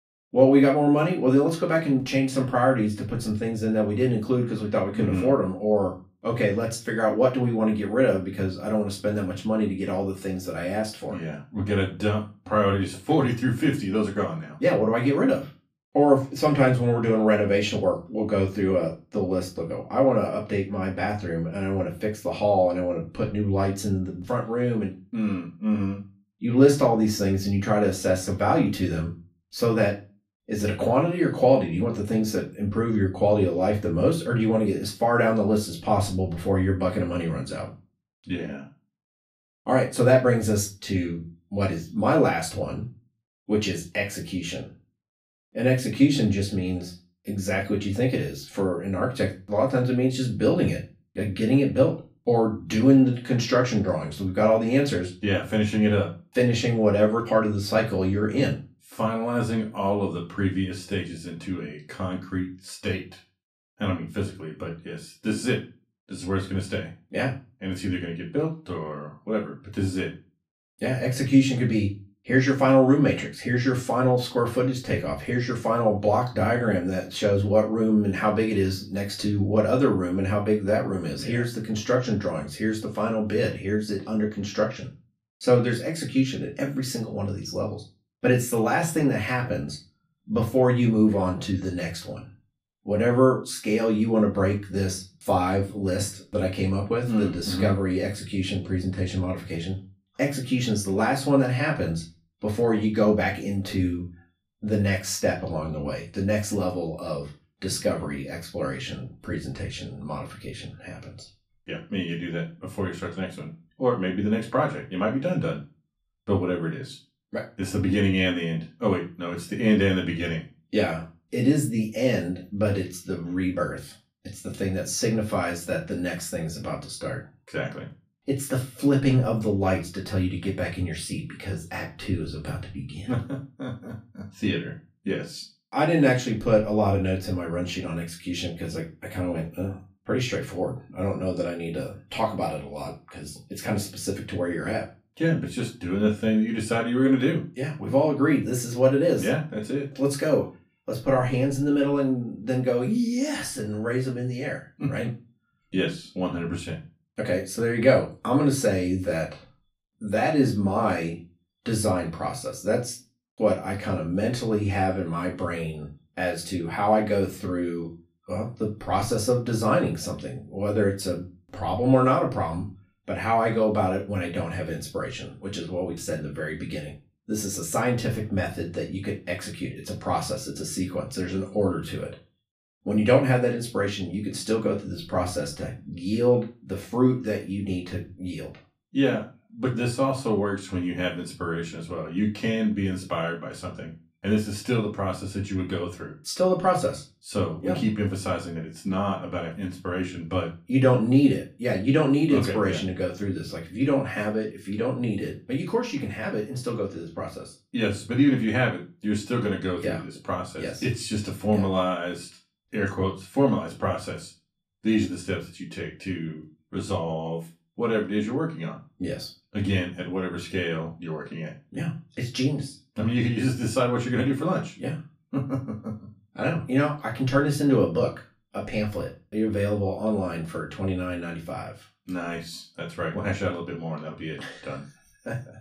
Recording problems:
off-mic speech; far
room echo; very slight; dies away in 0.3 s

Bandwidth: 14.5 kHz